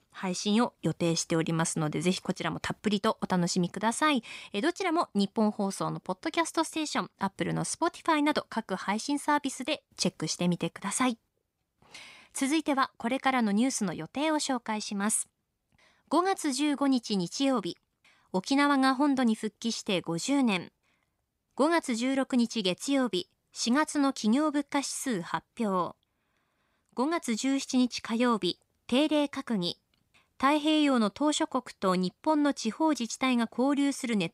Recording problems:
none

